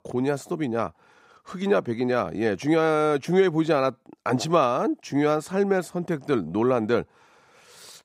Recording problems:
none

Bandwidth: 15.5 kHz